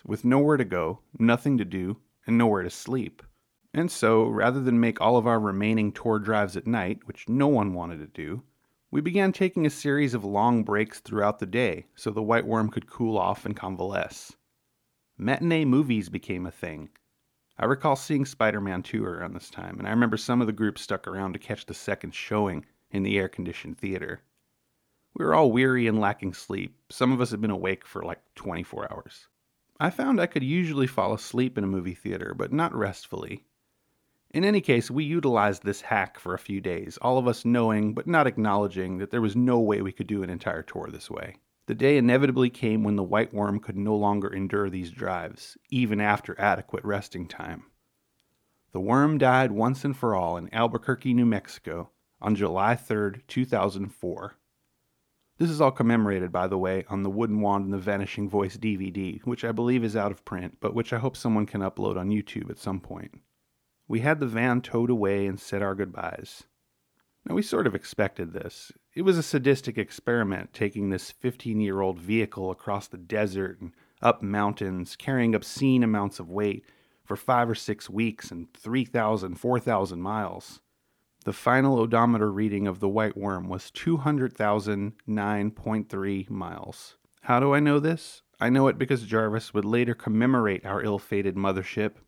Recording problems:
none

